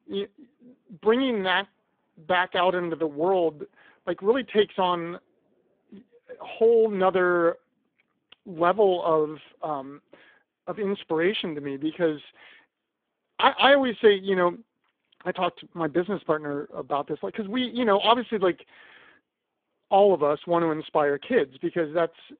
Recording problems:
phone-call audio; poor line; nothing above 3.5 kHz

